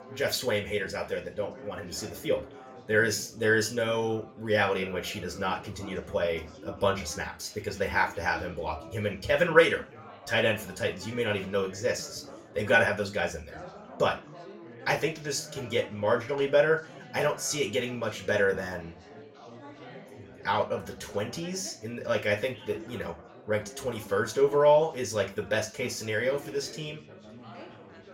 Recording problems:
off-mic speech; far
room echo; very slight; dies away in 0.3 s
chatter from many people; noticeable; throughout; 20 dB below the speech

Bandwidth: 16 kHz